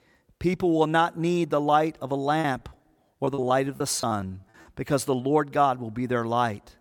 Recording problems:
choppy; very; from 2.5 to 4.5 s; 14% of the speech affected

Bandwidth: 17.5 kHz